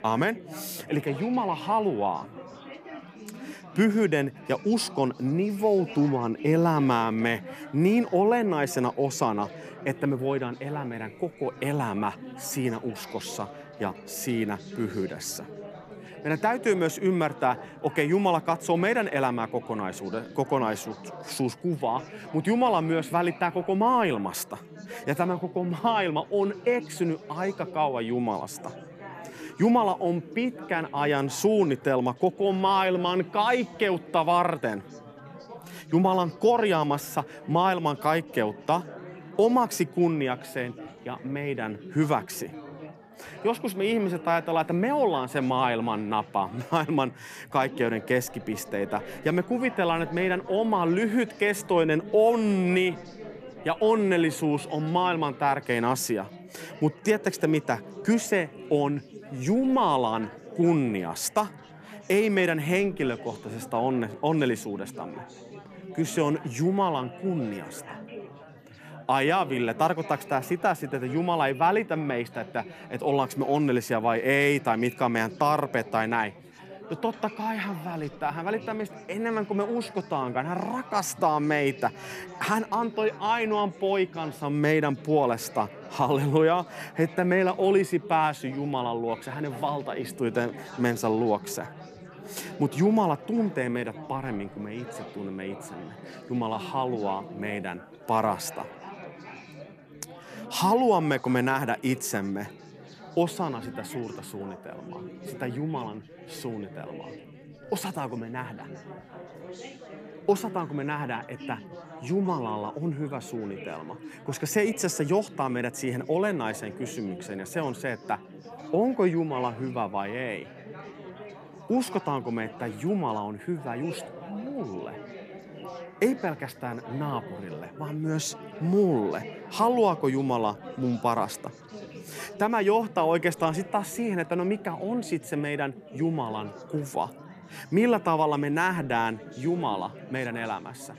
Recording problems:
chatter from many people; noticeable; throughout; 15 dB below the speech

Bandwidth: 14.5 kHz